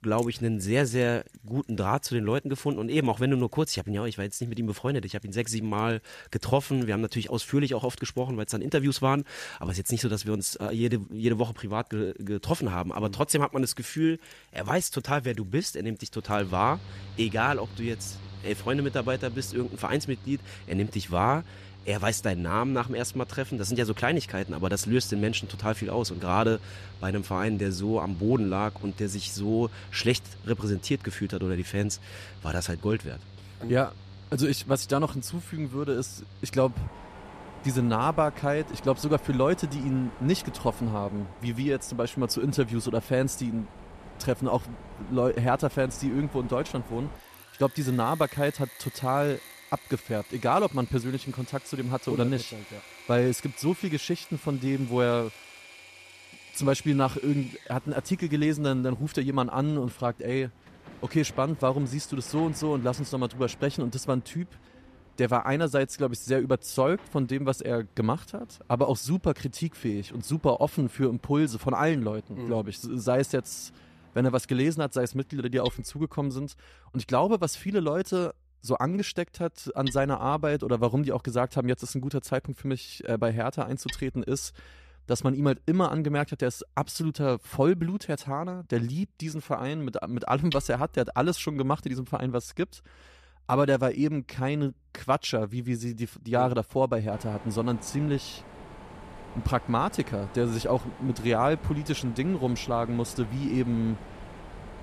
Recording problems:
machinery noise; noticeable; throughout; 15 dB below the speech

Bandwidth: 14.5 kHz